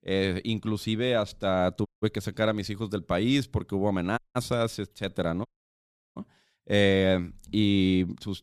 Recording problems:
audio cutting out; at 2 s, at 4 s and at 5.5 s for 0.5 s

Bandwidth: 14 kHz